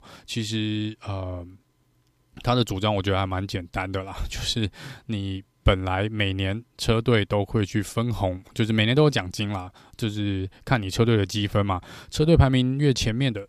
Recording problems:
none

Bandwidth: 15 kHz